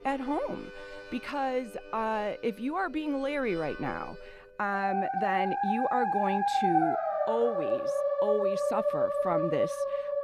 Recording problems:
background music; very loud; throughout; 3 dB above the speech

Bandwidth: 15.5 kHz